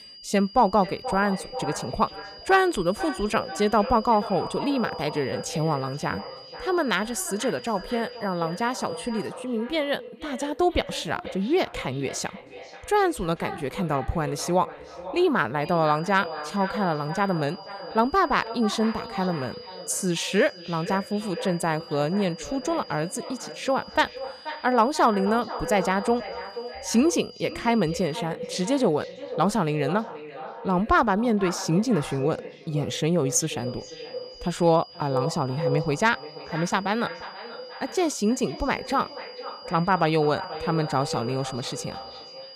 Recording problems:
echo of what is said; strong; throughout; 480 ms later, 10 dB below the speech
high-pitched whine; noticeable; until 9.5 s, from 16 to 28 s and from 34 s on; 5 kHz, 20 dB below the speech

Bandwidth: 14 kHz